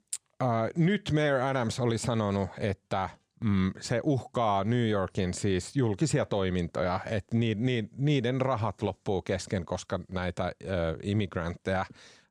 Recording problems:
none

